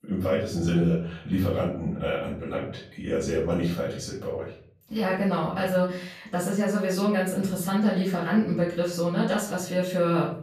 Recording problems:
off-mic speech; far
room echo; noticeable; dies away in 0.6 s

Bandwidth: 14.5 kHz